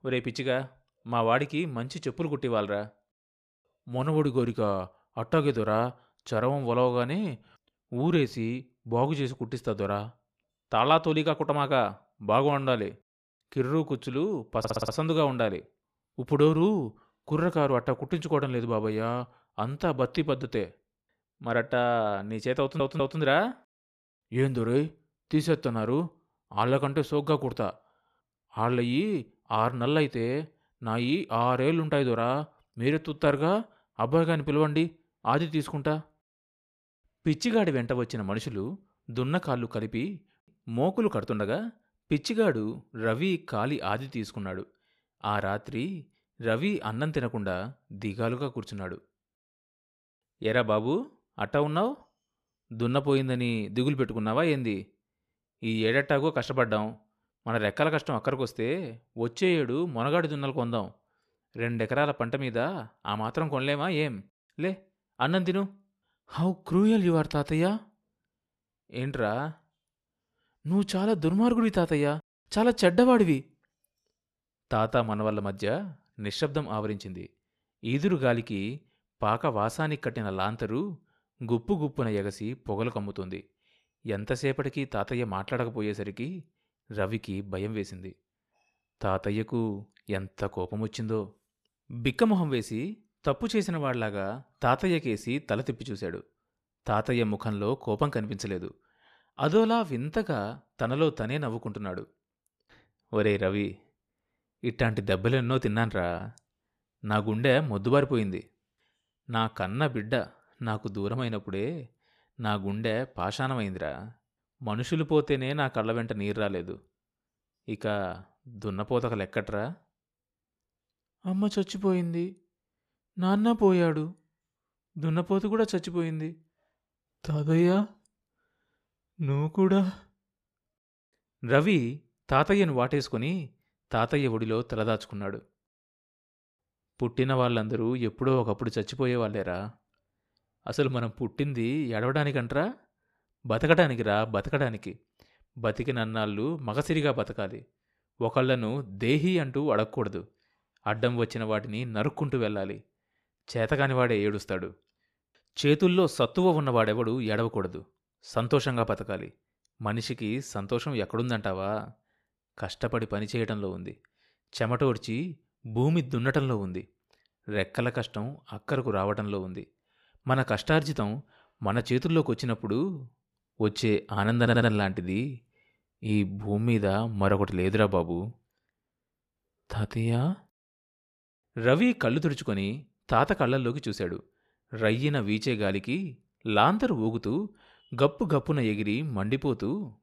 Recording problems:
audio stuttering; at 15 s, at 23 s and at 2:54

